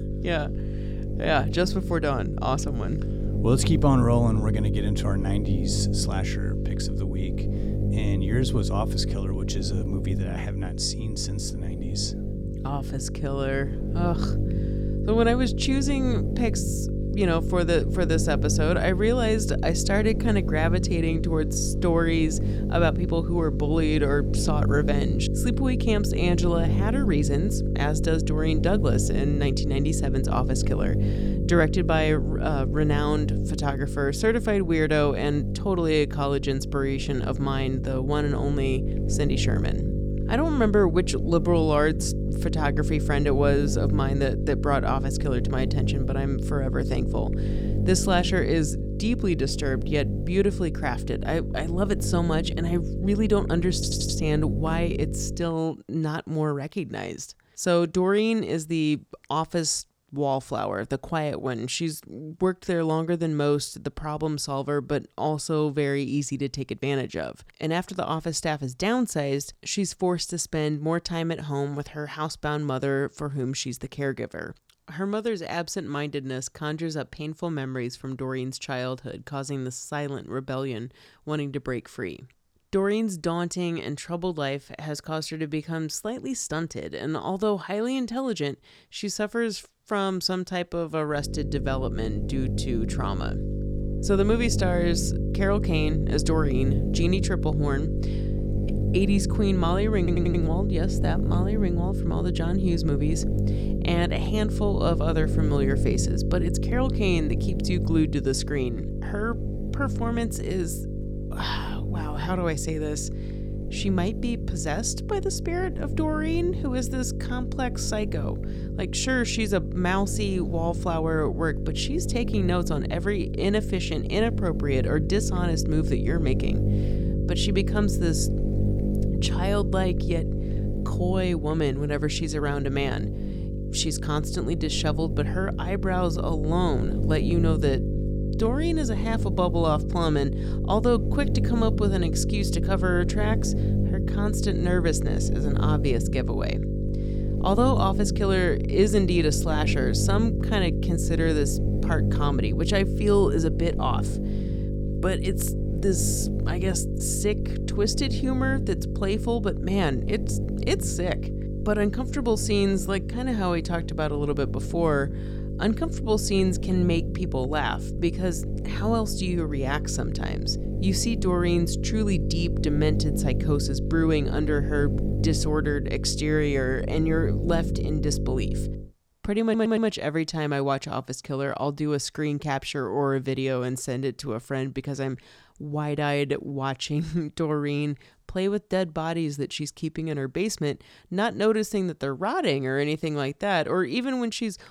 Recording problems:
electrical hum; loud; until 55 s and from 1:31 to 2:59; 50 Hz, 8 dB below the speech
audio stuttering; at 54 s, at 1:40 and at 2:59

